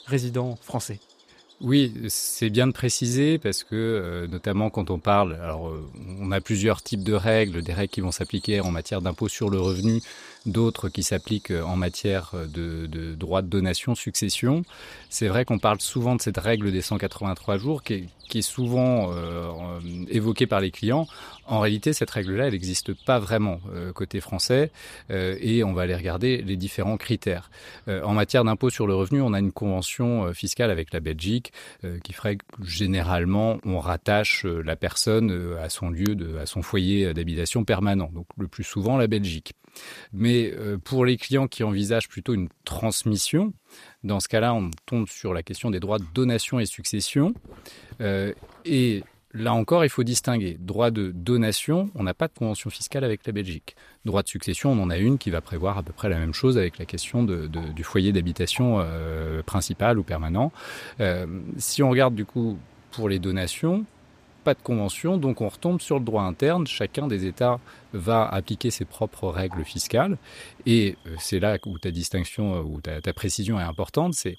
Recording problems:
animal sounds; faint; throughout; 25 dB below the speech

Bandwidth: 14.5 kHz